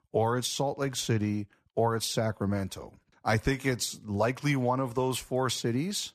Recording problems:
none

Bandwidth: 13.5 kHz